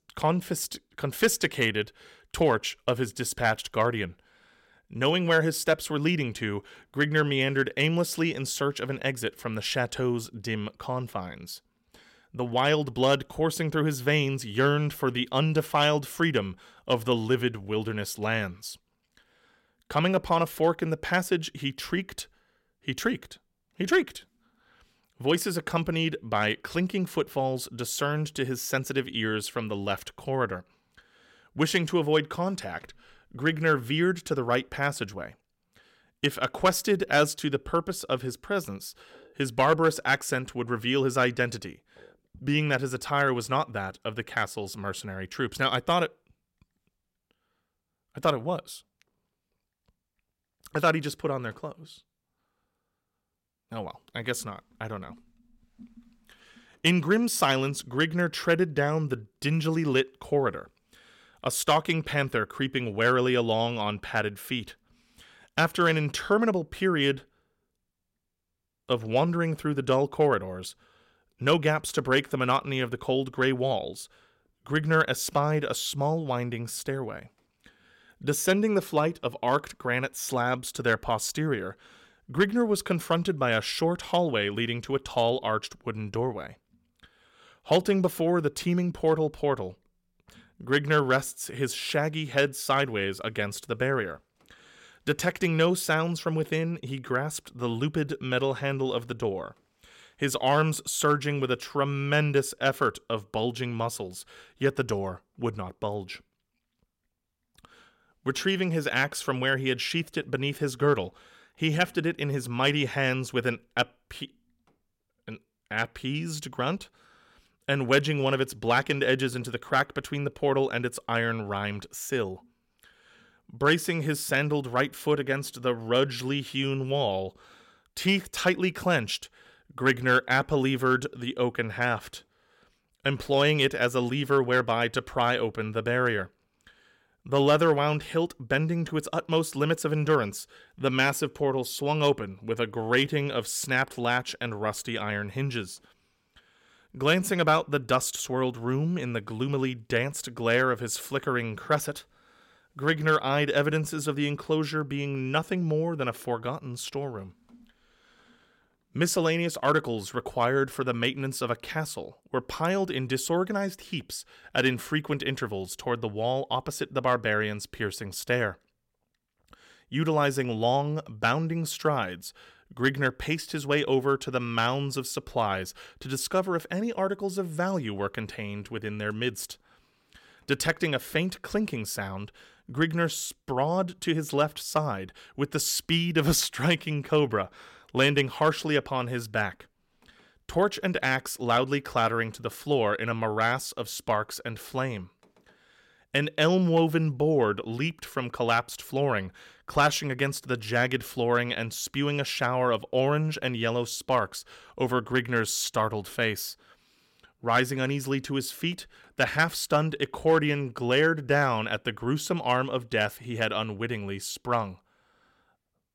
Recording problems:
none

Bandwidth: 16.5 kHz